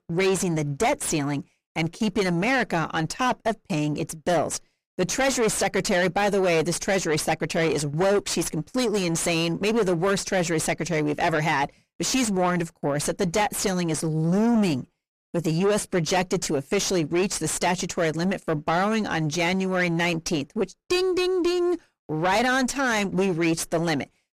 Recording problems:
distortion; heavy; 6 dB below the speech

